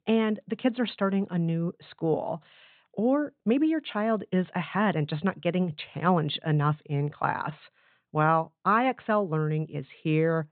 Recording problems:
high frequencies cut off; severe; nothing above 4 kHz

